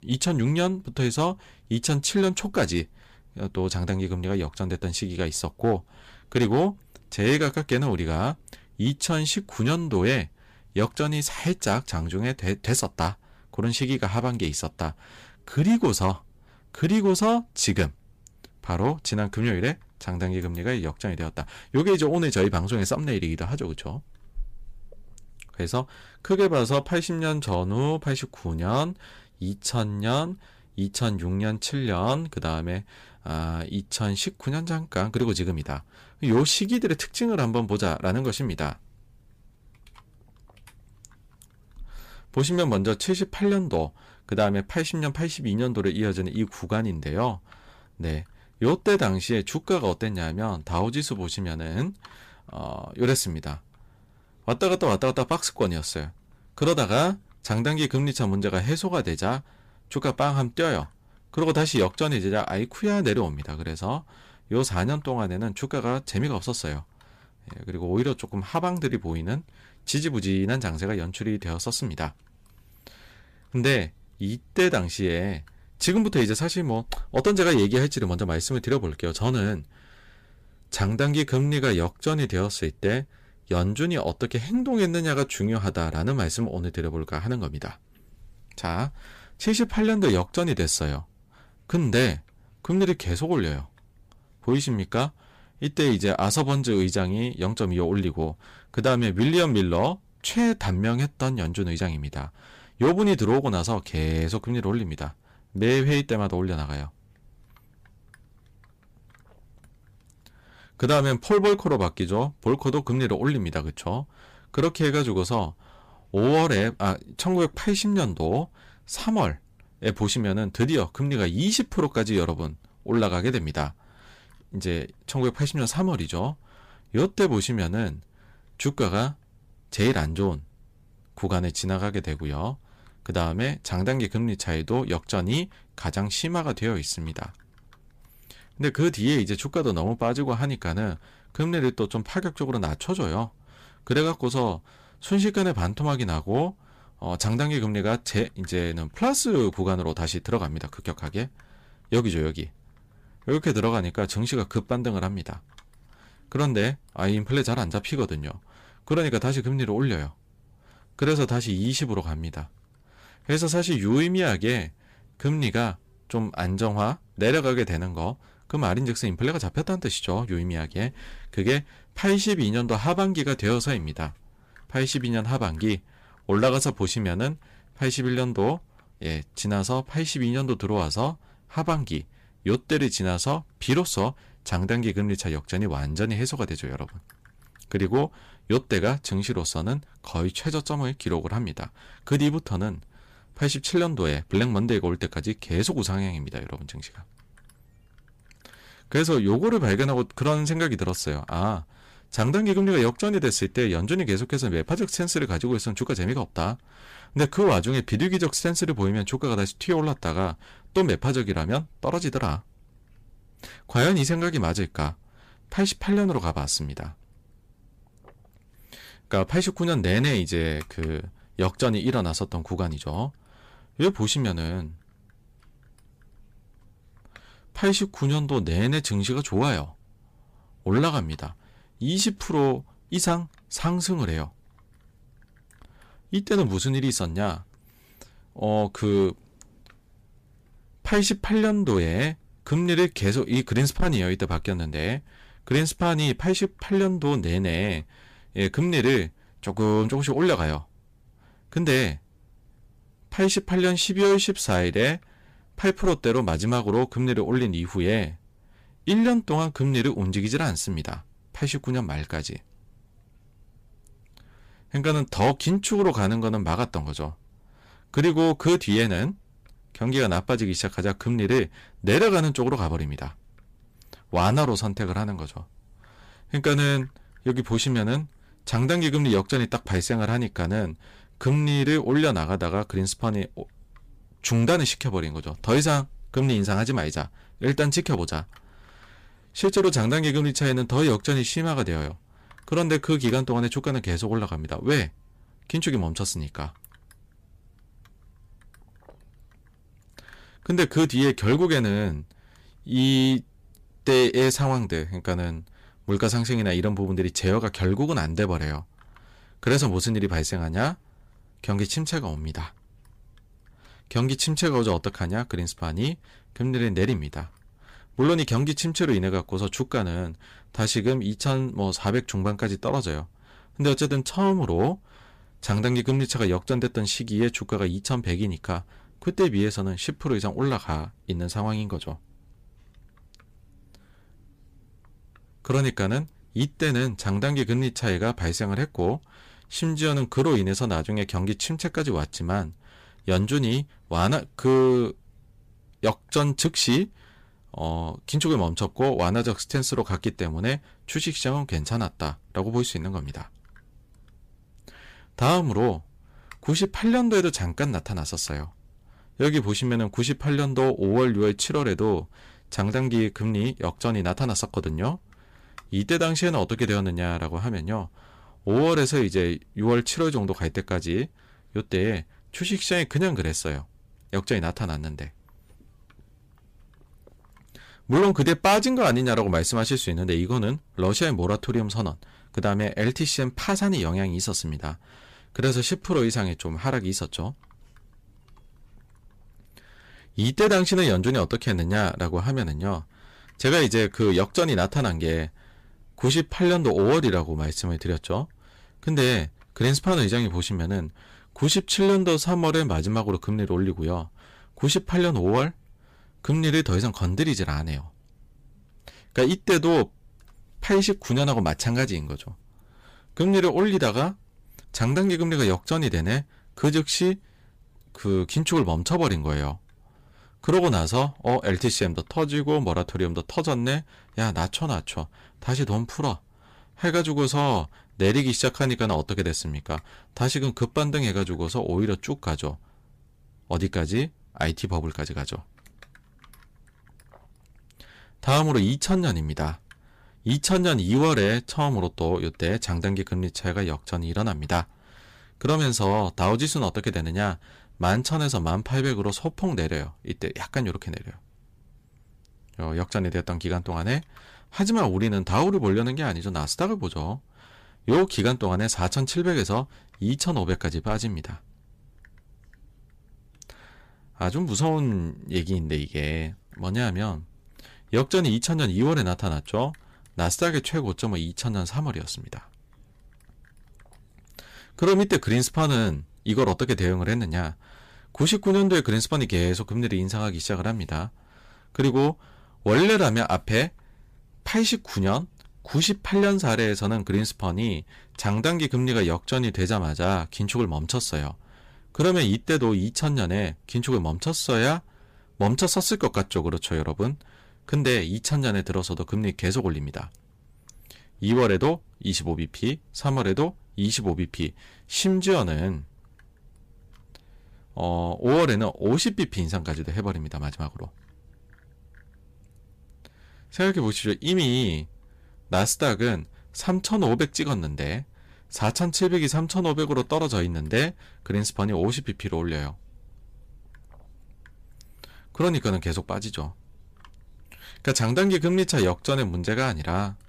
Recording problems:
distortion; slight; 3% of the sound clipped

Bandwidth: 15 kHz